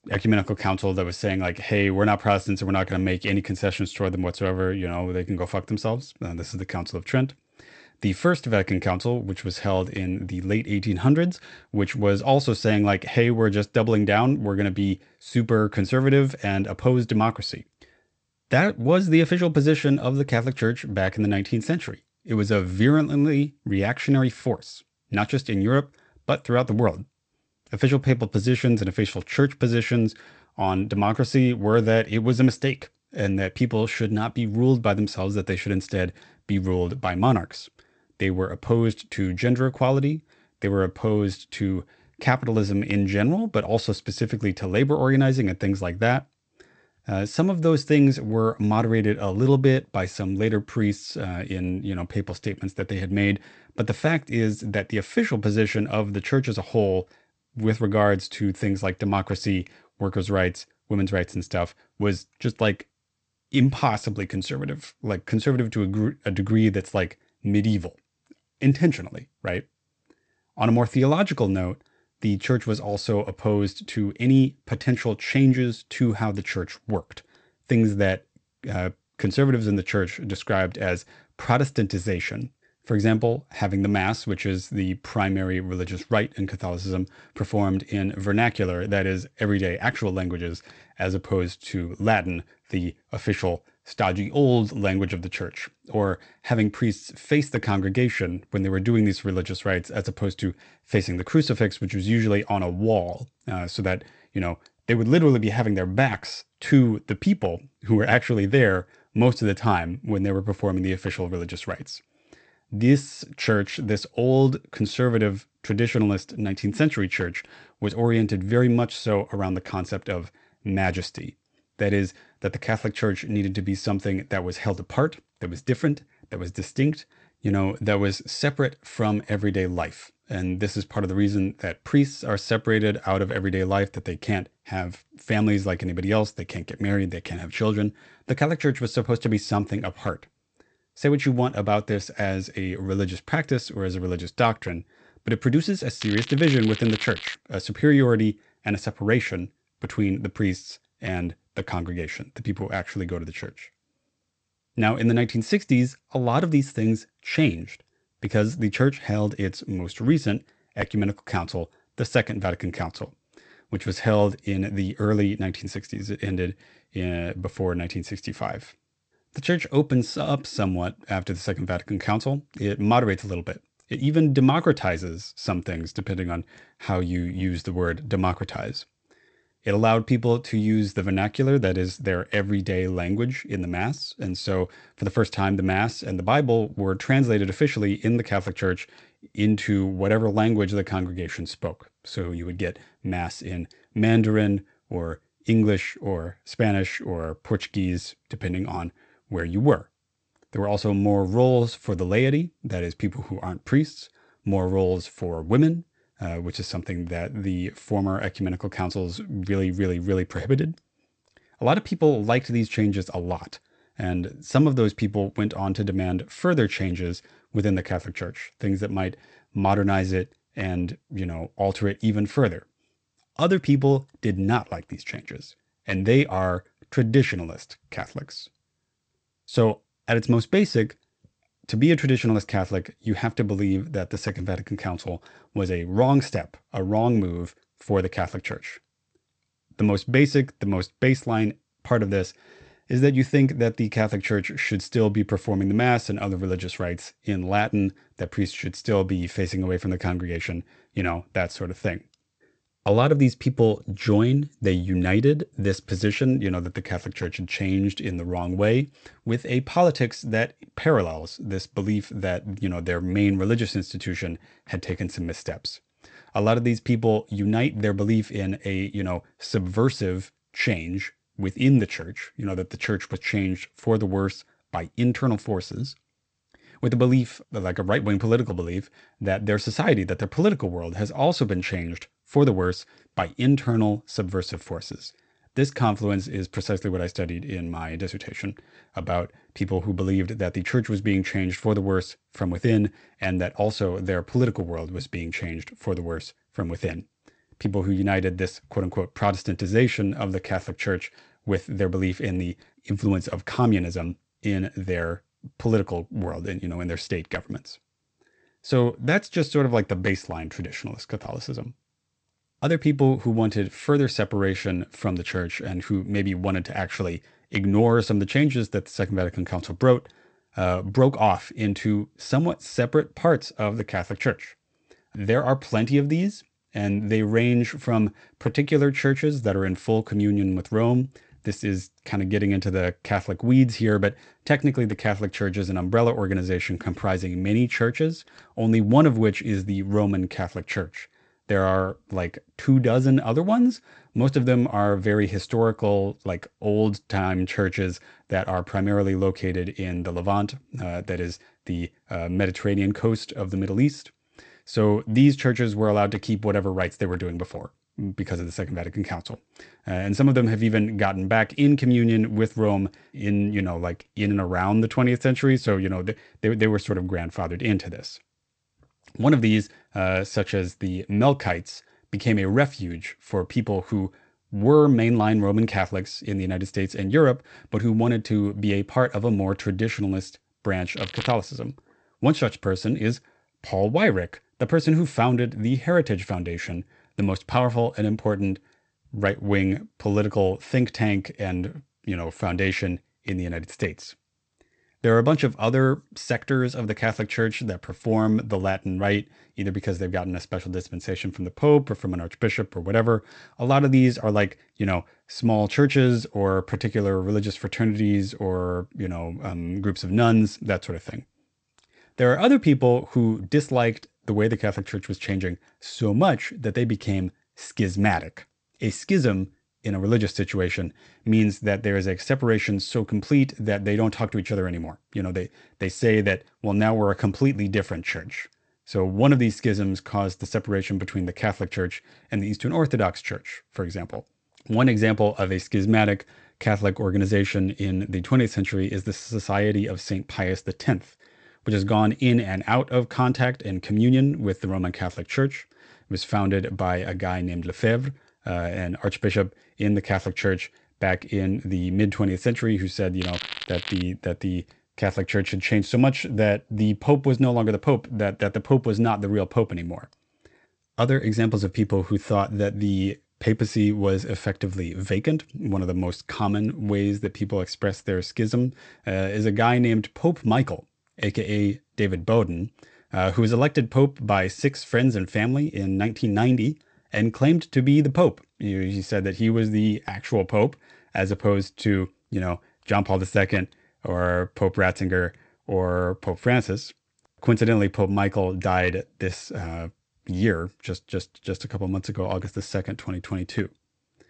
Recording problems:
garbled, watery; slightly; nothing above 8 kHz
crackling; loud; from 2:26 to 2:27, at 6:21 and at 7:33; 10 dB below the speech

